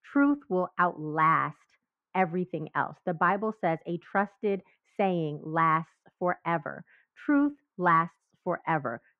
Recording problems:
muffled; very; fading above 1.5 kHz

